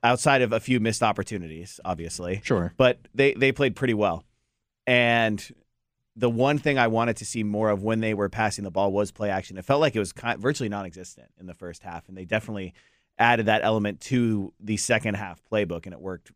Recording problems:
none

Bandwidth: 15 kHz